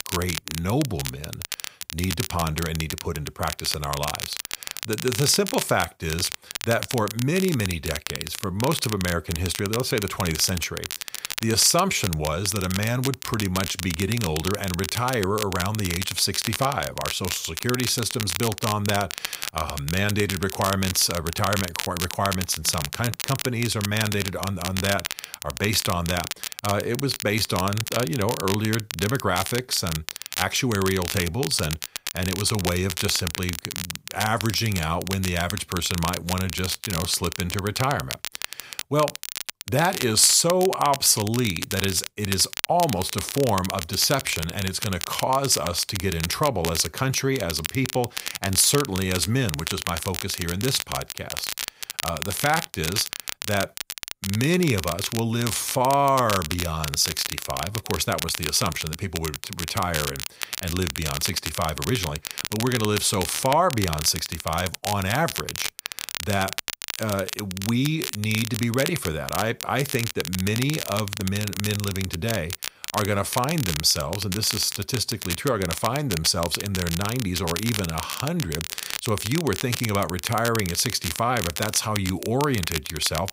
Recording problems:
crackle, like an old record; loud; 6 dB below the speech

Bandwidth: 15.5 kHz